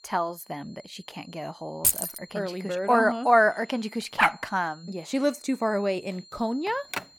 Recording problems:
high-pitched whine; faint; throughout; 4 kHz, 25 dB below the speech
jangling keys; loud; at 2 s; peak 4 dB above the speech
dog barking; loud; at 4 s; peak 3 dB above the speech
phone ringing; noticeable; at 6.5 s; peak 9 dB below the speech

